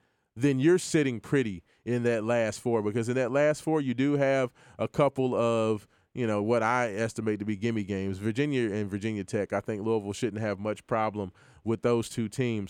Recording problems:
none

